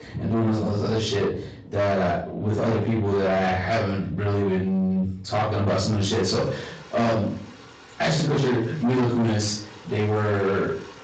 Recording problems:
distortion; heavy; 7 dB below the speech
off-mic speech; far
room echo; noticeable; dies away in 0.4 s
garbled, watery; slightly; nothing above 7.5 kHz
rain or running water; noticeable; throughout; 20 dB below the speech

